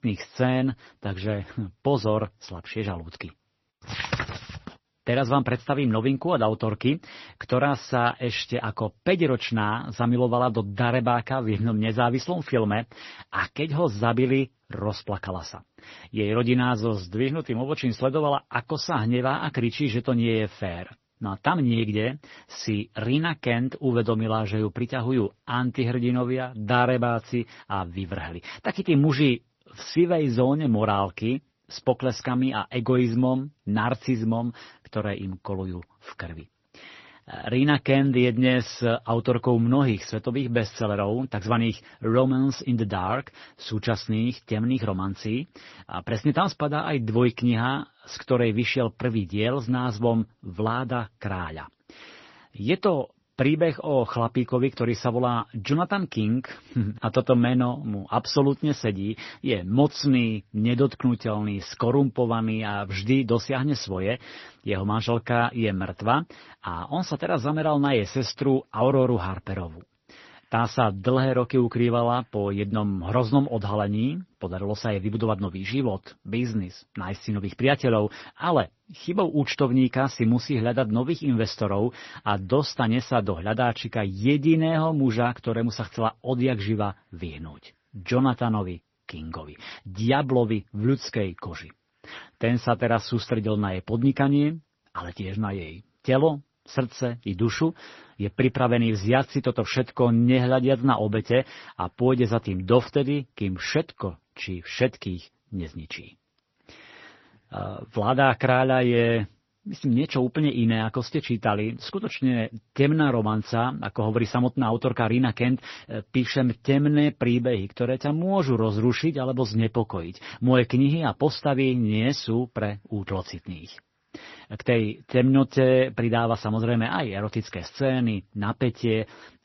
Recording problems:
garbled, watery; slightly; nothing above 6 kHz

